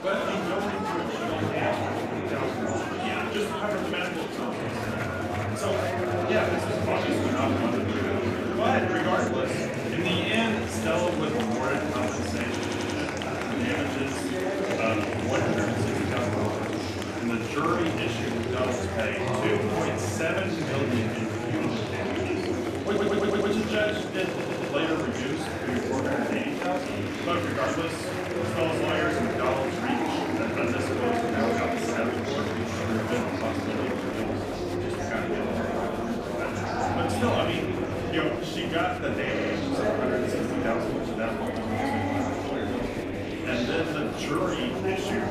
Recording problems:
off-mic speech; far
room echo; noticeable; dies away in 0.5 s
murmuring crowd; very loud; throughout; 2 dB above the speech
audio stuttering; 4 times, first at 13 s

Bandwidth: 14.5 kHz